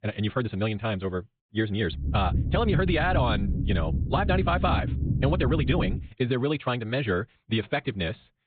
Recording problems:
high frequencies cut off; severe; nothing above 4 kHz
wrong speed, natural pitch; too fast; 1.6 times normal speed
low rumble; noticeable; from 2 to 6 s; 10 dB below the speech

